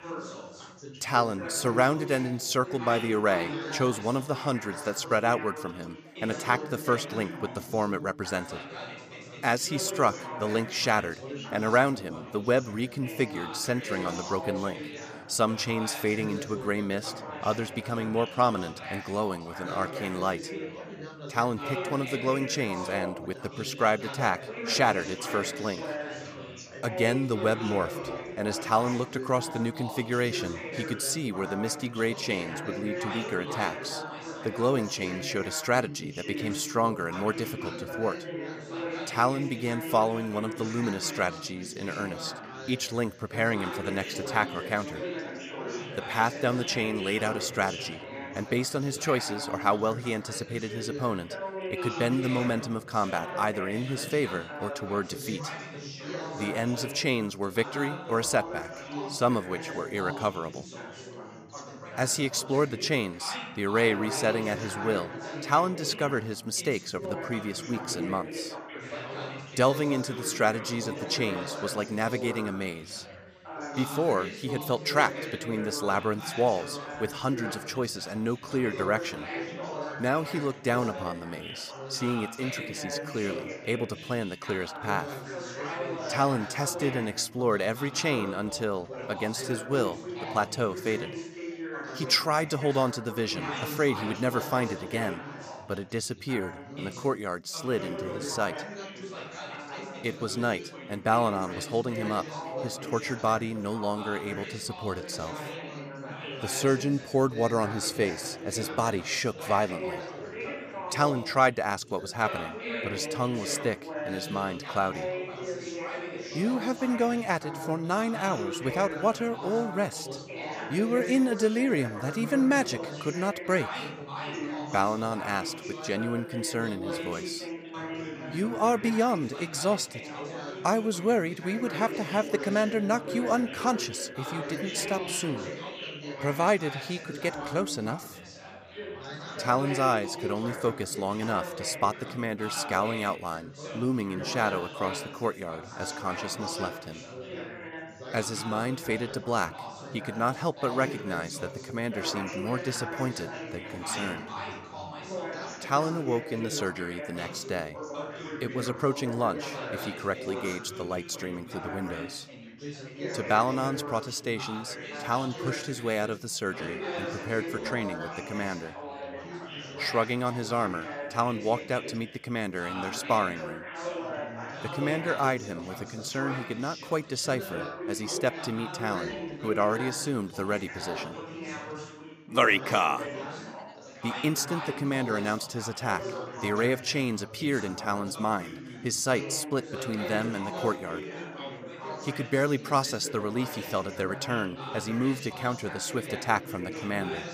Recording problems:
background chatter; loud; throughout; 4 voices, 8 dB below the speech

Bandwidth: 15 kHz